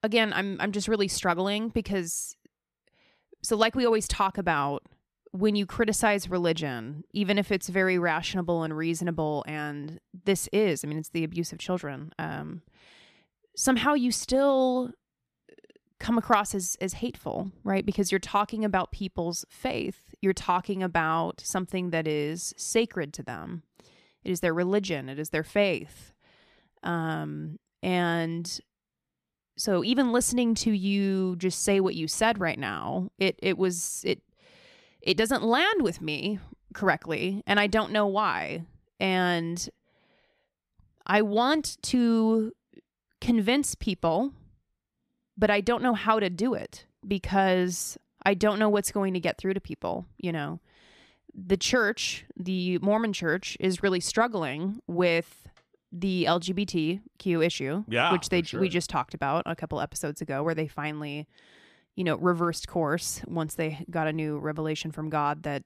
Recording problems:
none

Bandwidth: 14.5 kHz